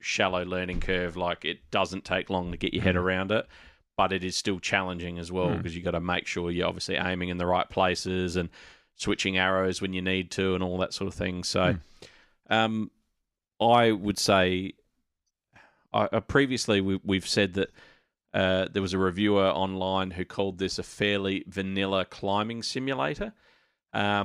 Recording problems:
abrupt cut into speech; at the end

